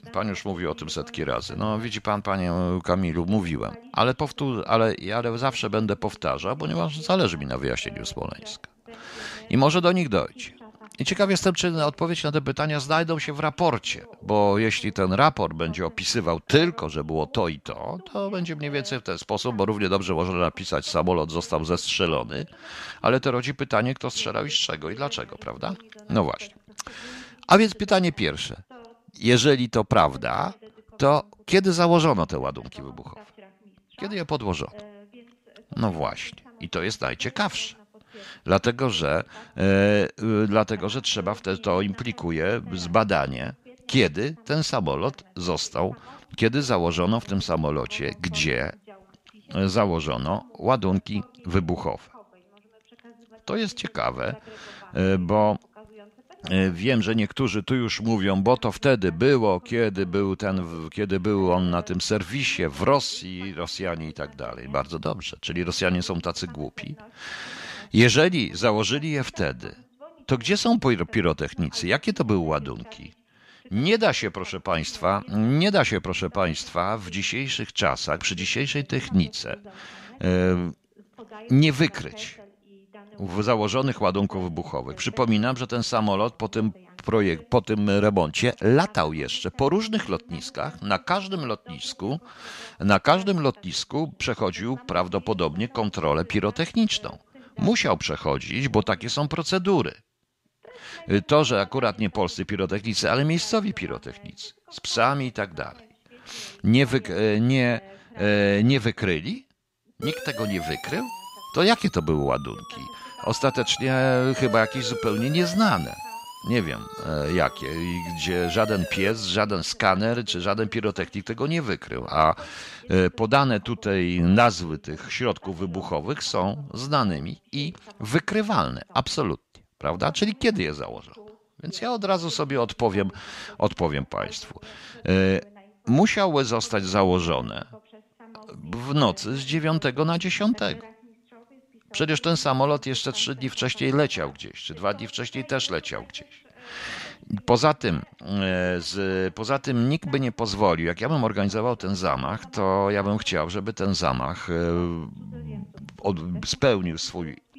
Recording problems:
voice in the background; faint; throughout; 25 dB below the speech
siren; noticeable; from 1:50 to 1:59; peak 7 dB below the speech

